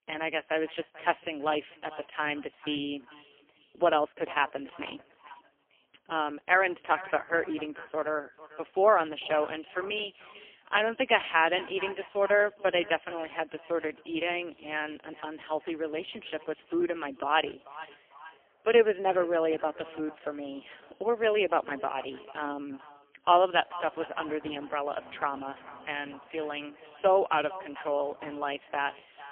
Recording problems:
phone-call audio; poor line; nothing above 3.5 kHz
echo of what is said; noticeable; throughout; 440 ms later, 20 dB below the speech
traffic noise; faint; throughout; 30 dB below the speech

